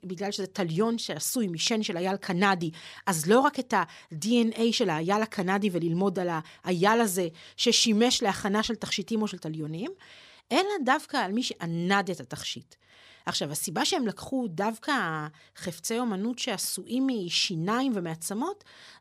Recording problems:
none

